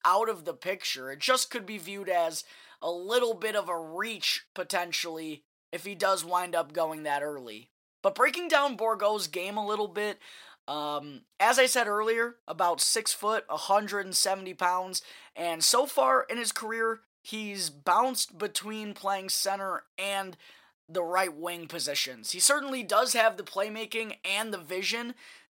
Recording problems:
thin; very slightly; fading below 700 Hz

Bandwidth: 16 kHz